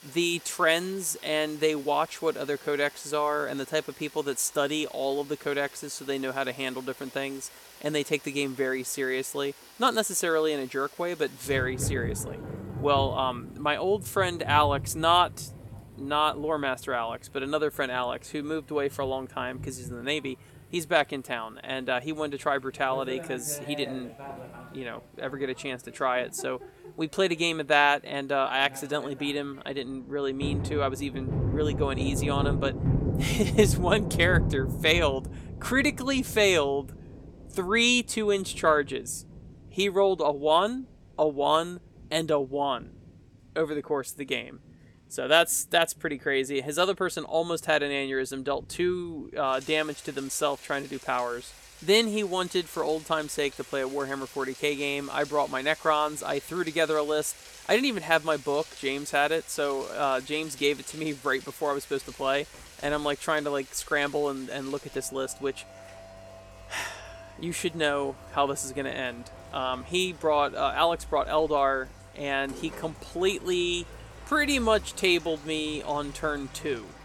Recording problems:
rain or running water; noticeable; throughout; 10 dB below the speech

